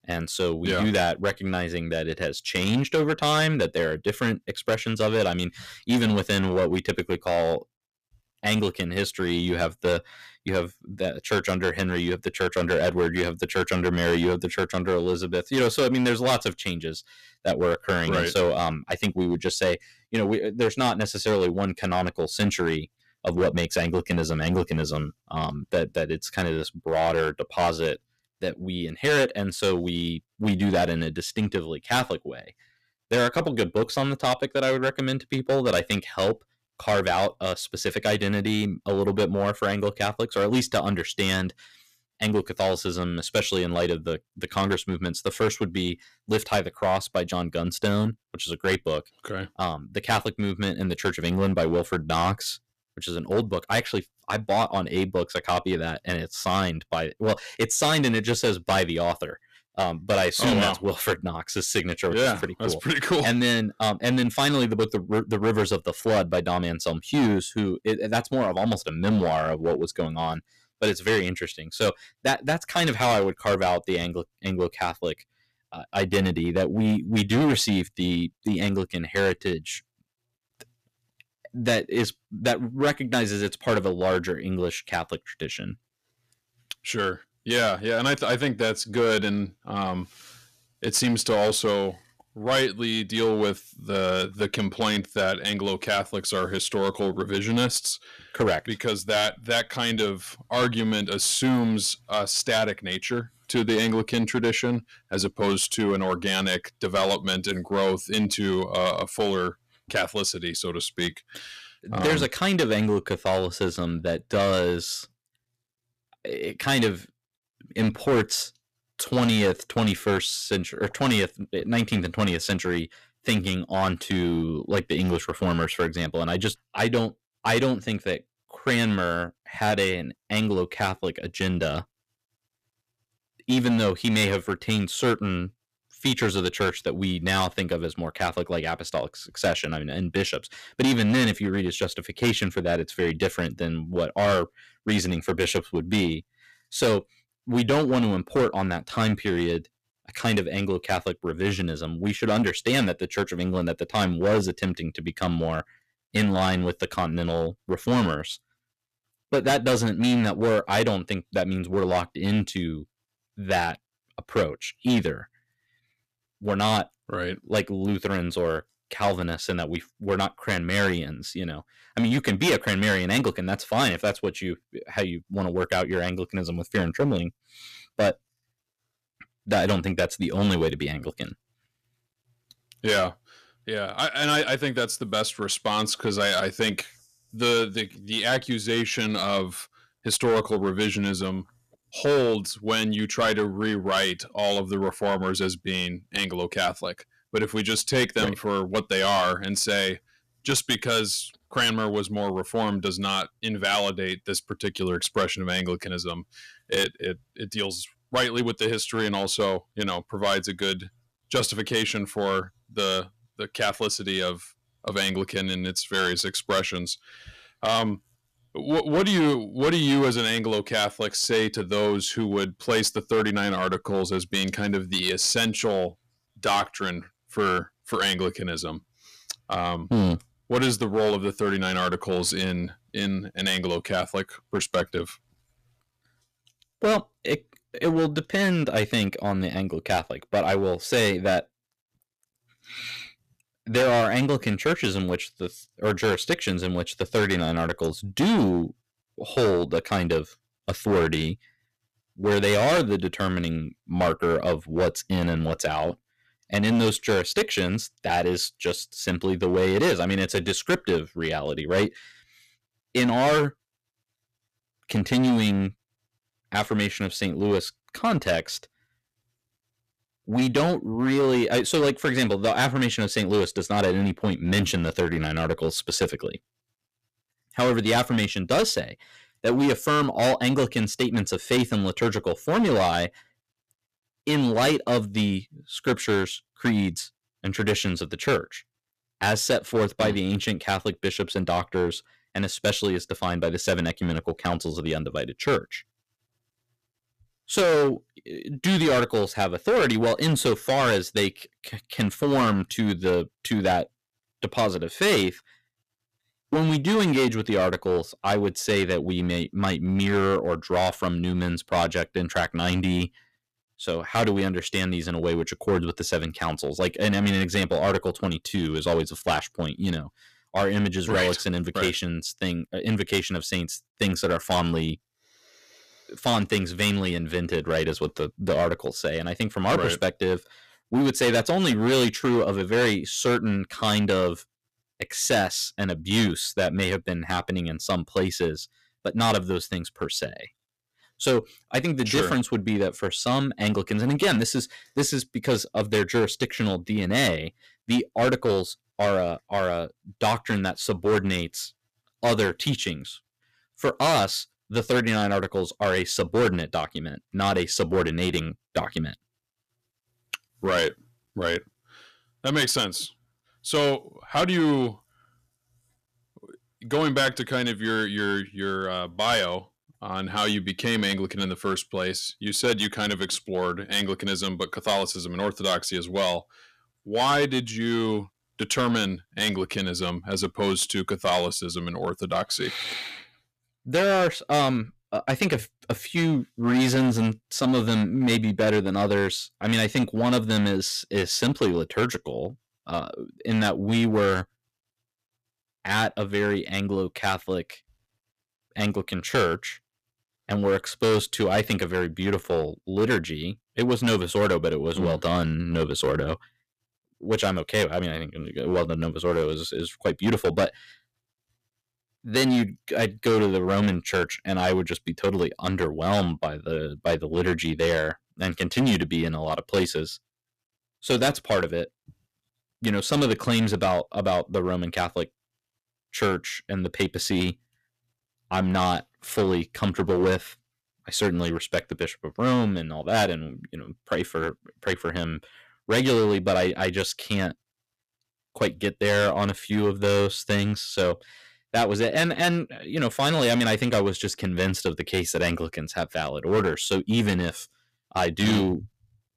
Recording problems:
distortion; heavy; 7% of the sound clipped

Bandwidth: 14.5 kHz